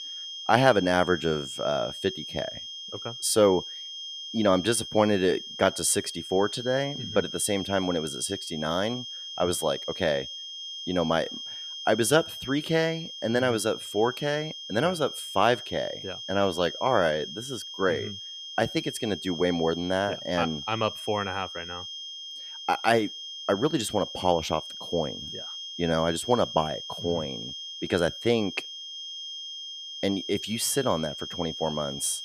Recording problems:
high-pitched whine; loud; throughout; 3 kHz, 9 dB below the speech

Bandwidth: 14.5 kHz